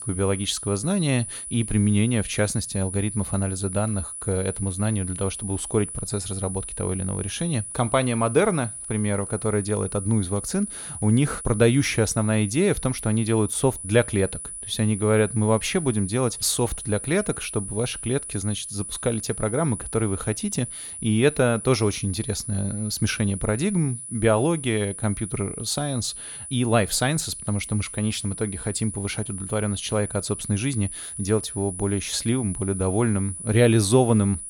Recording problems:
high-pitched whine; loud; throughout; 10 kHz, 8 dB below the speech

